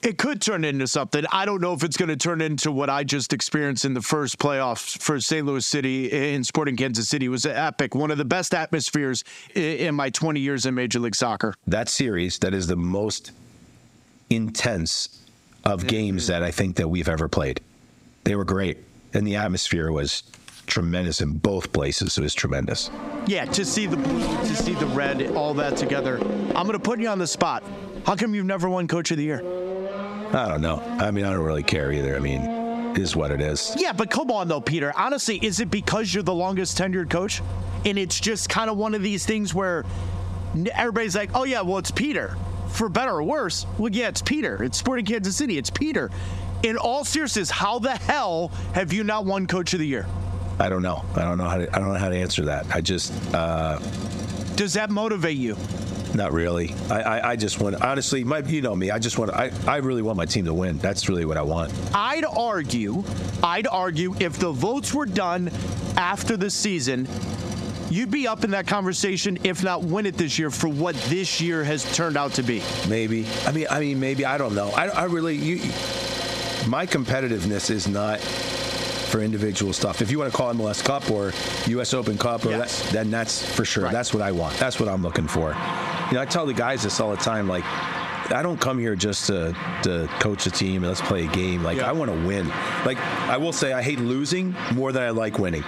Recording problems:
squashed, flat; heavily, background pumping
traffic noise; loud; from 22 s on; 8 dB below the speech

